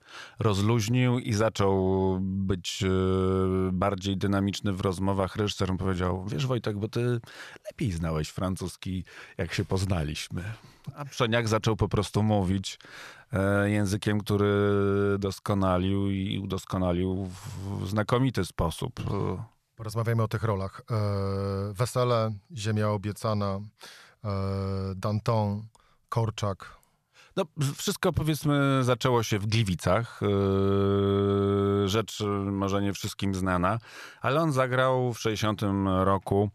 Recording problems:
none

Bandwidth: 14 kHz